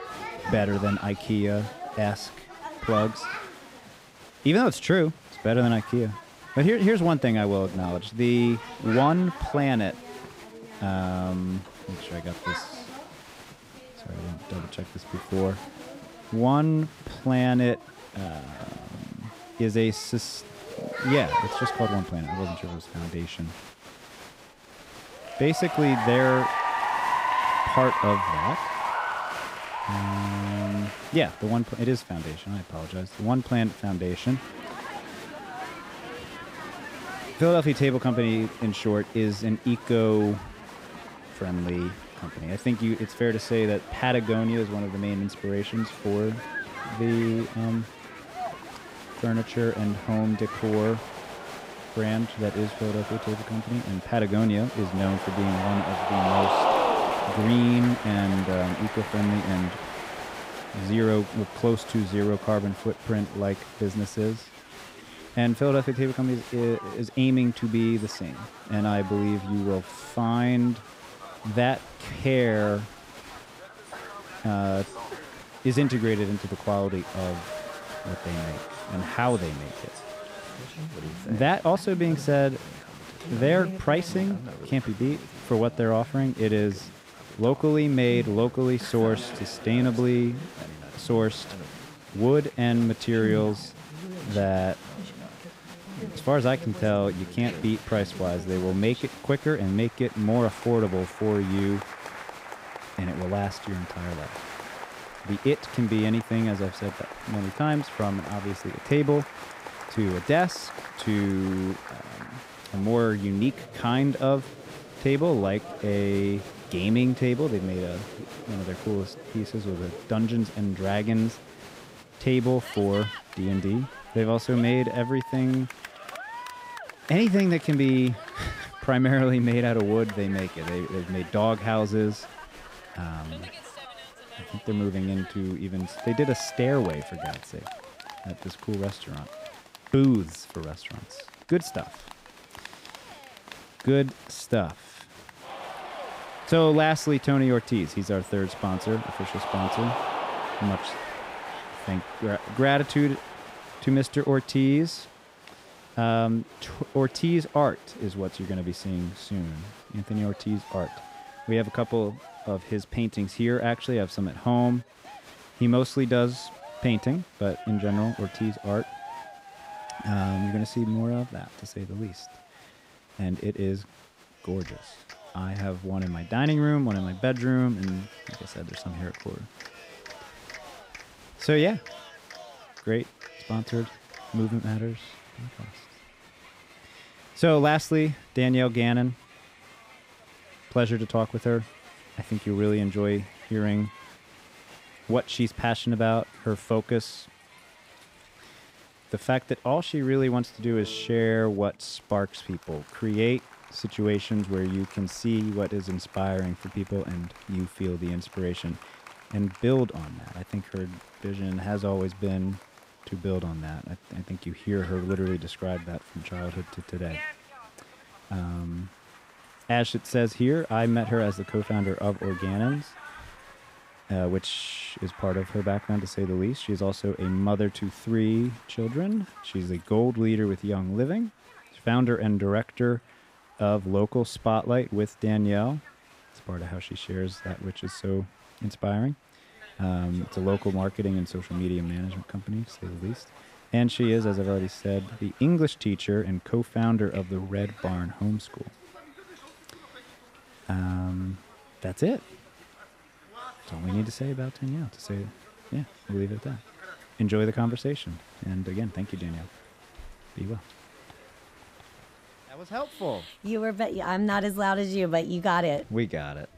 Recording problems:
crowd noise; noticeable; throughout; 10 dB below the speech

